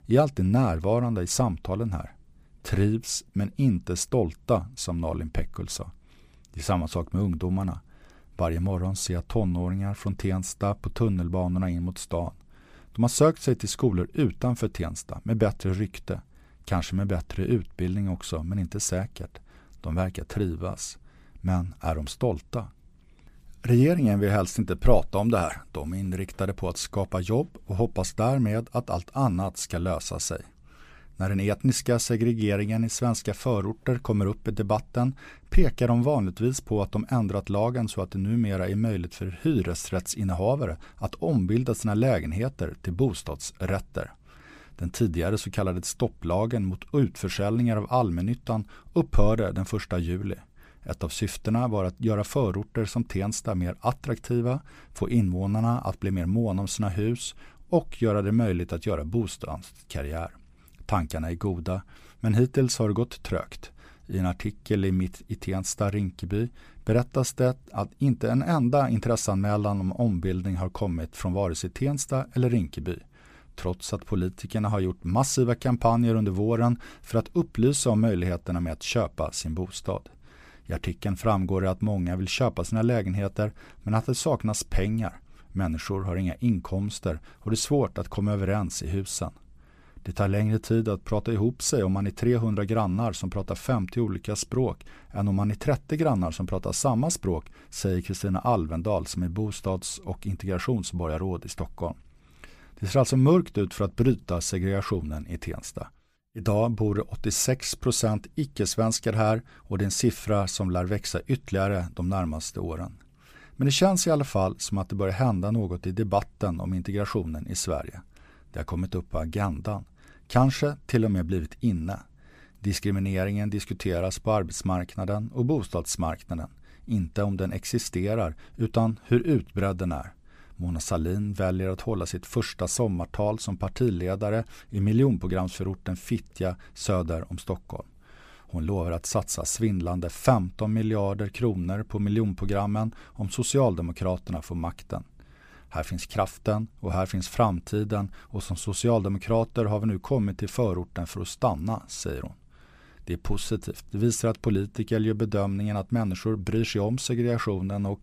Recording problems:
none

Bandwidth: 15 kHz